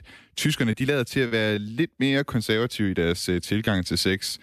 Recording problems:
choppy; occasionally; 3% of the speech affected

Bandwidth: 14.5 kHz